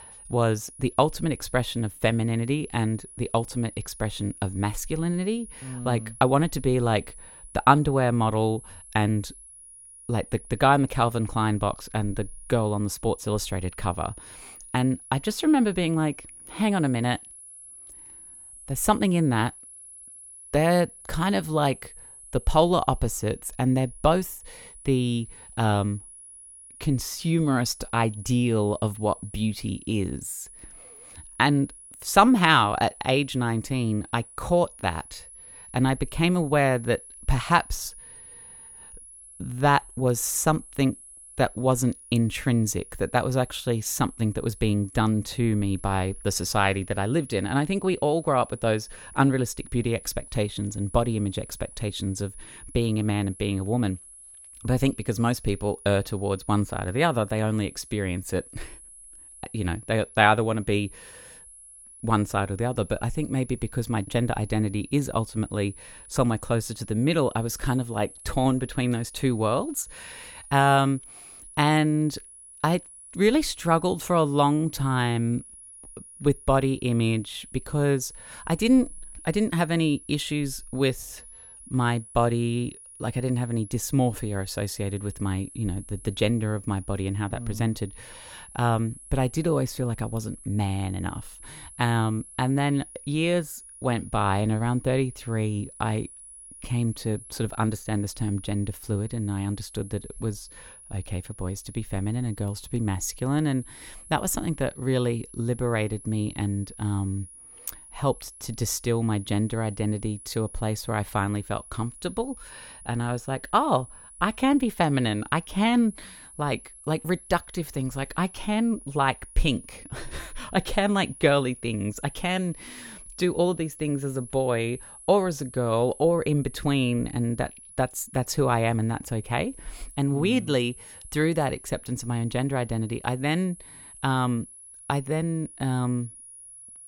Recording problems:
high-pitched whine; noticeable; throughout; 10.5 kHz, 20 dB below the speech

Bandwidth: 16.5 kHz